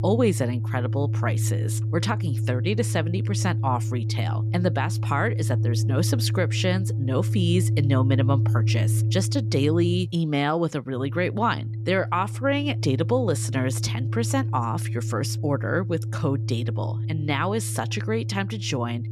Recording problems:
background music; very loud; throughout; as loud as the speech

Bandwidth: 13.5 kHz